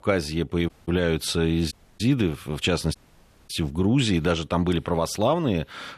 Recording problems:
audio cutting out; at 0.5 s, at 1.5 s and at 3 s for 0.5 s

